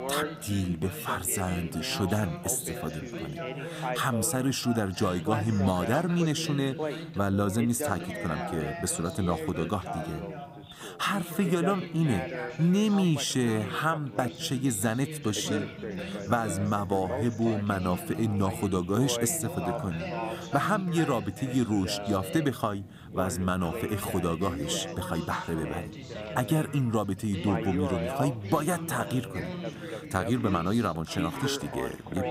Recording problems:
background chatter; loud; throughout; 3 voices, 7 dB below the speech

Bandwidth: 15.5 kHz